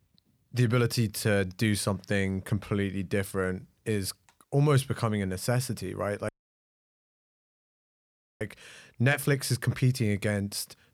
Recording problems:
audio cutting out; at 6.5 s for 2 s

